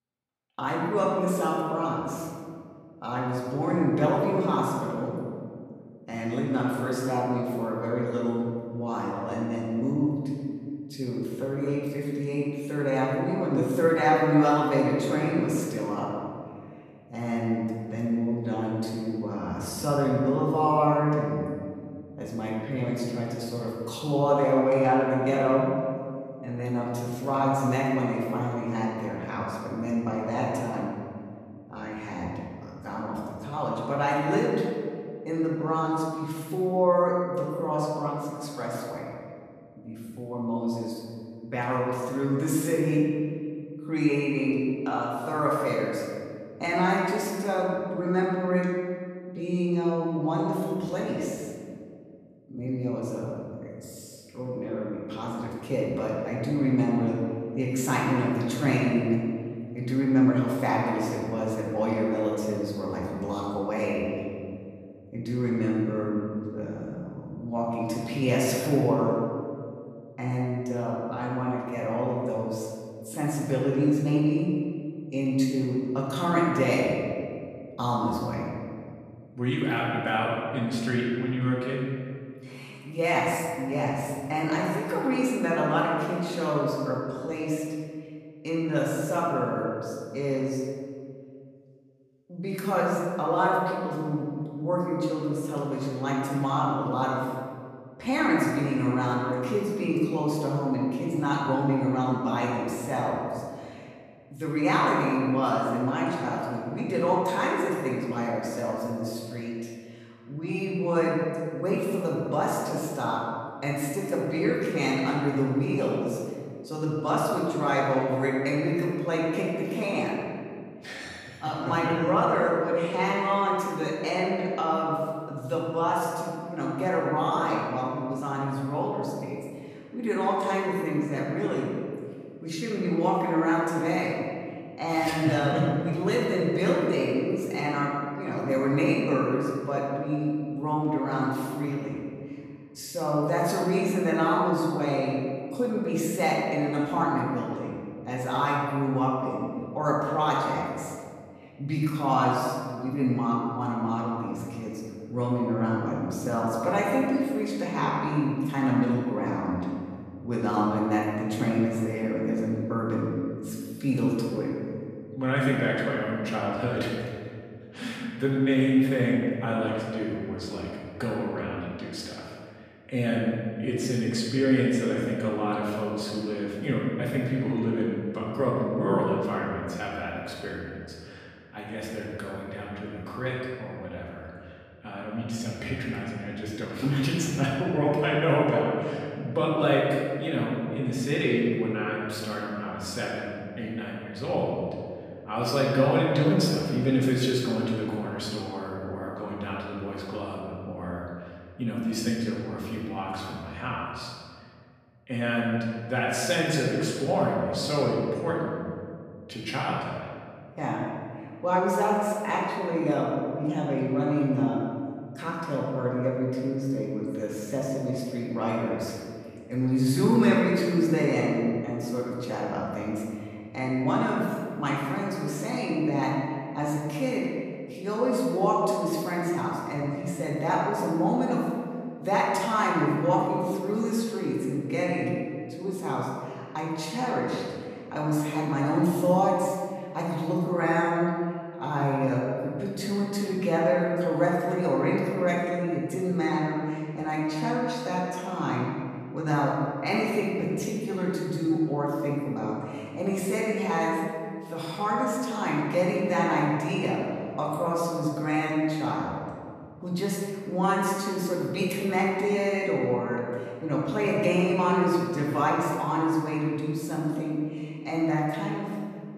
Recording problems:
off-mic speech; far
room echo; noticeable; dies away in 1.9 s

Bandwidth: 14.5 kHz